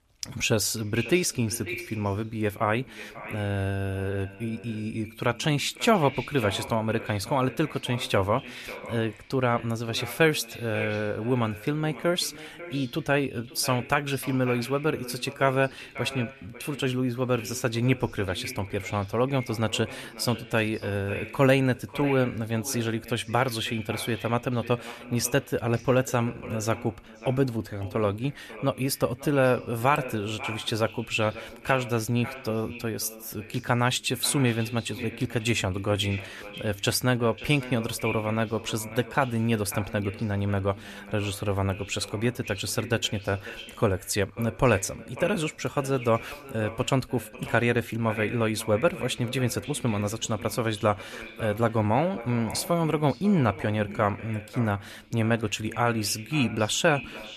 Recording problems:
echo of what is said; noticeable; throughout; 540 ms later, 15 dB below the speech

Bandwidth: 14 kHz